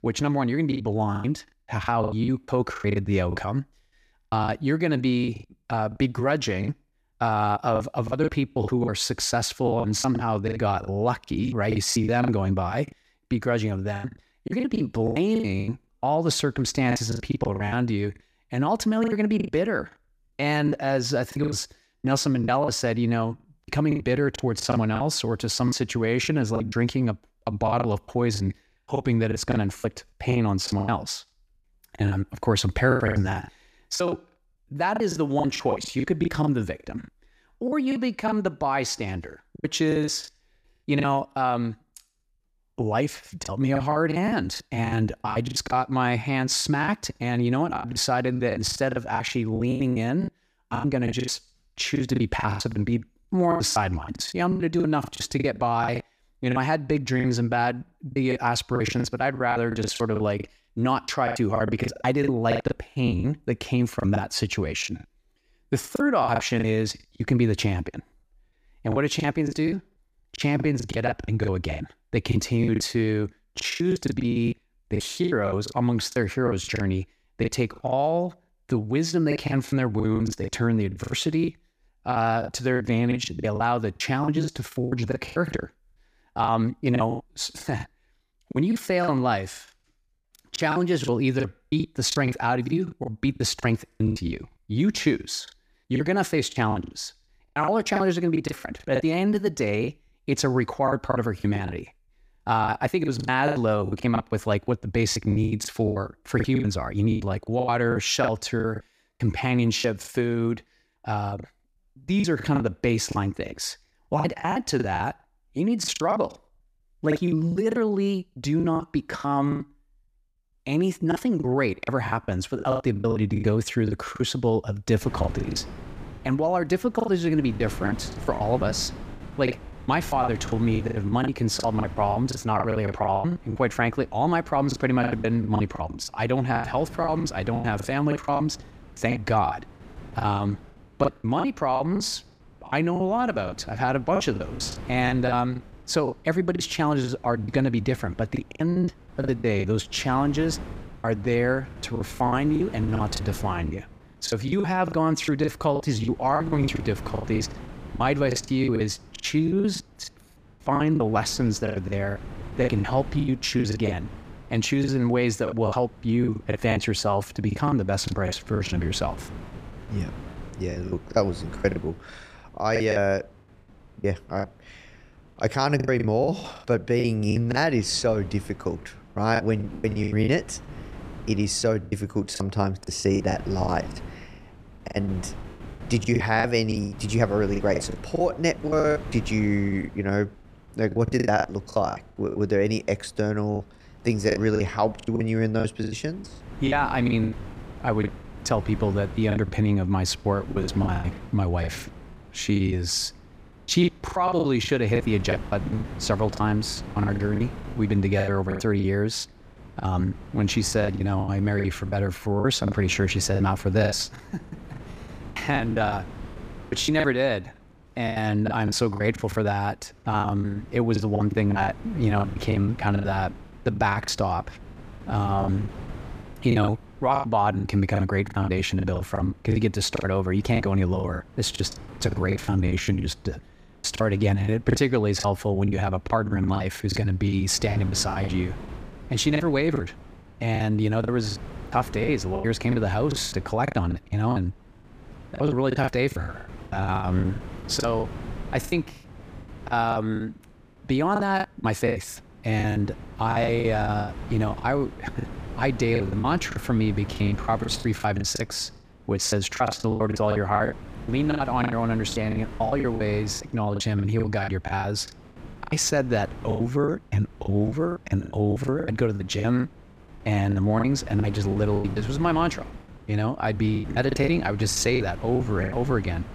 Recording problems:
wind noise on the microphone; occasional gusts; from 2:05 on; 20 dB below the speech
choppy; very; 16% of the speech affected

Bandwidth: 15 kHz